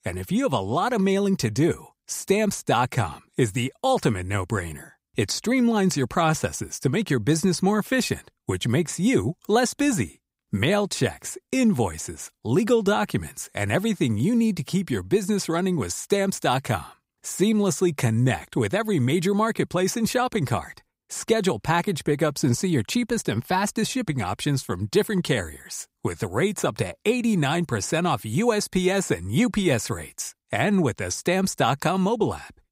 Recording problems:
none

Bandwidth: 15.5 kHz